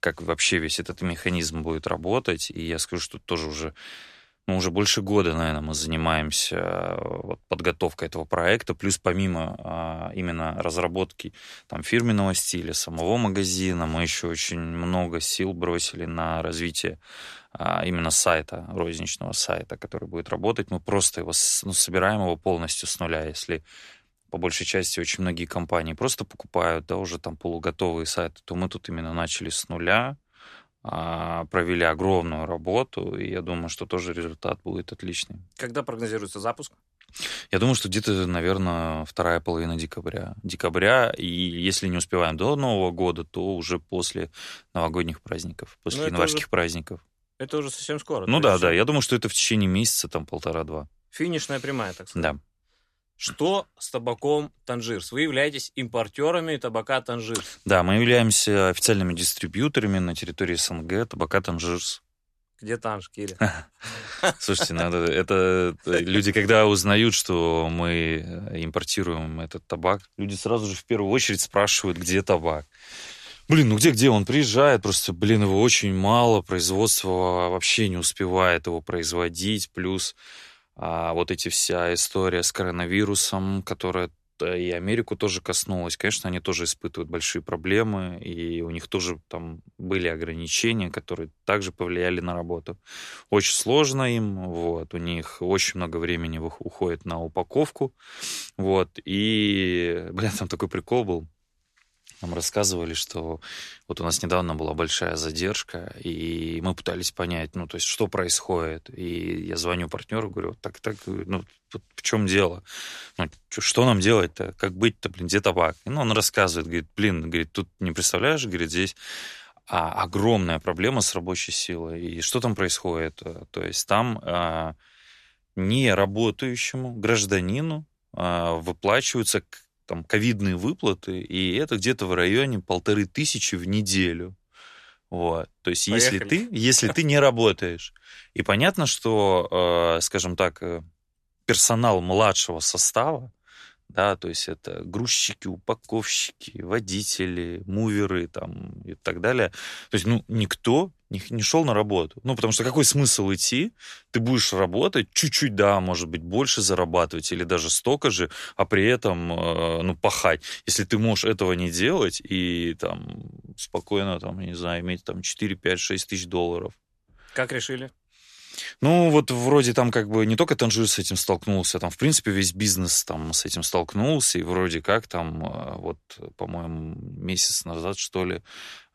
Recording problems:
none

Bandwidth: 13.5 kHz